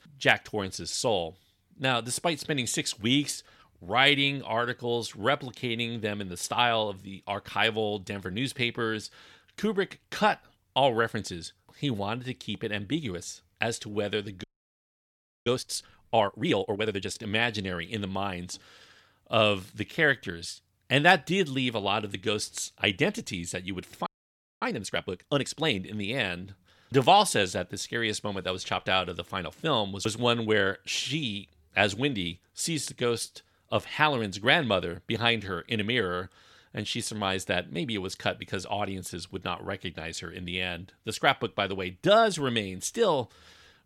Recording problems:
audio freezing; at 14 s for 1 s and at 24 s for 0.5 s

